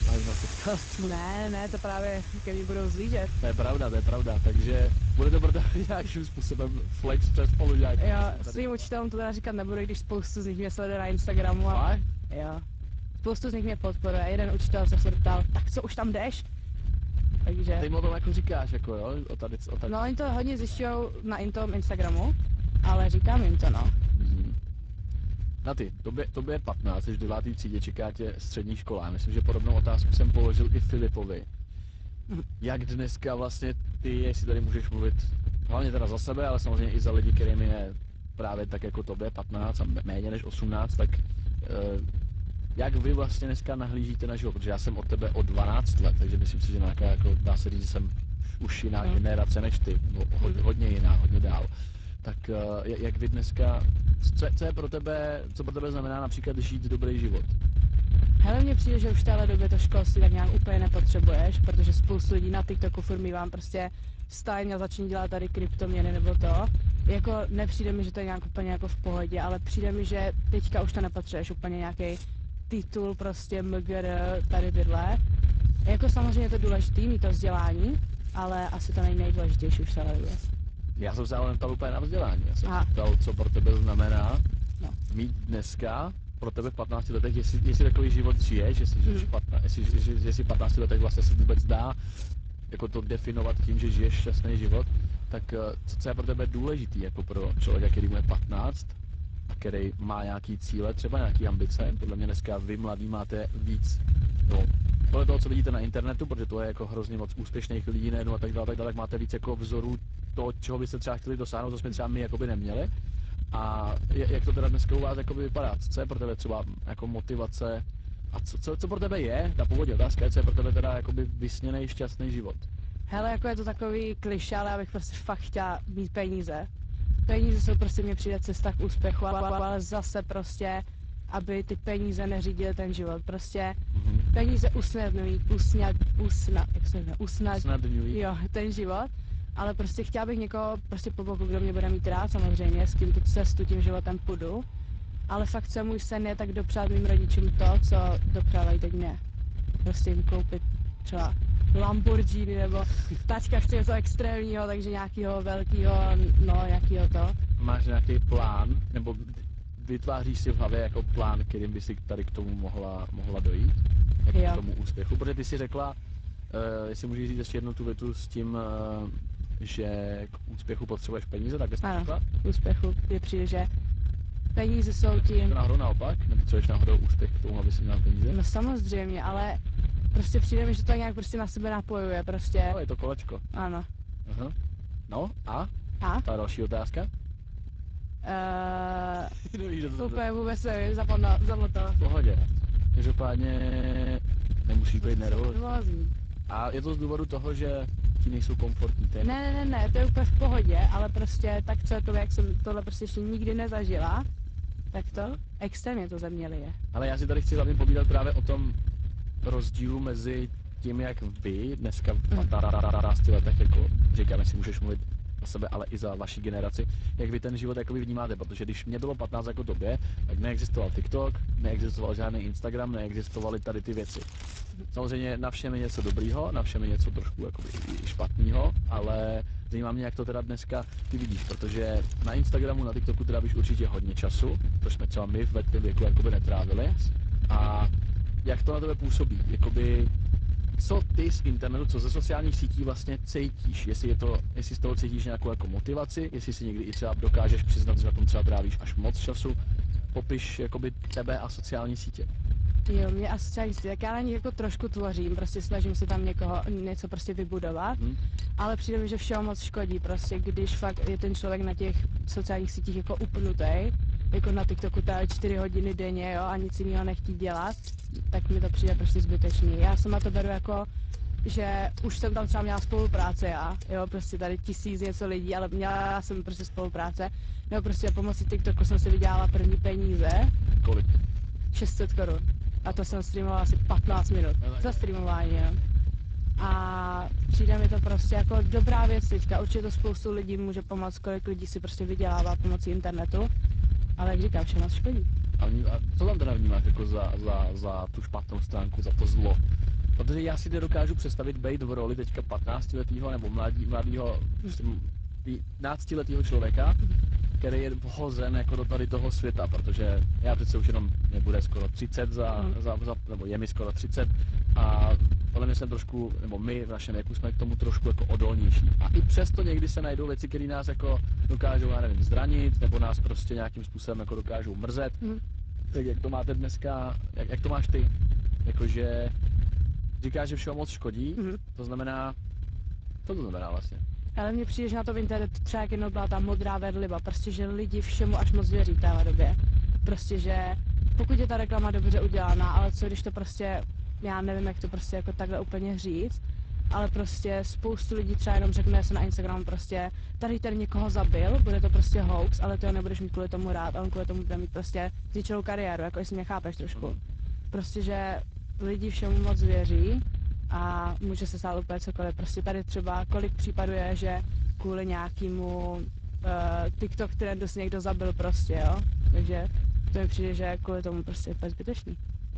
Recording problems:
garbled, watery; slightly; nothing above 7.5 kHz
low rumble; noticeable; throughout; 10 dB below the speech
household noises; faint; throughout; 20 dB below the speech
audio stuttering; 4 times, first at 2:09

